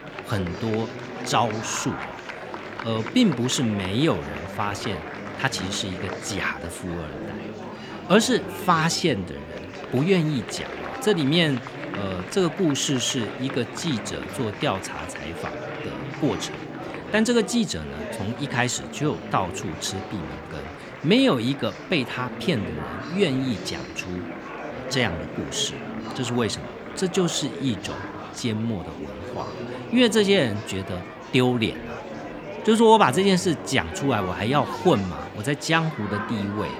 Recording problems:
murmuring crowd; noticeable; throughout; 10 dB below the speech

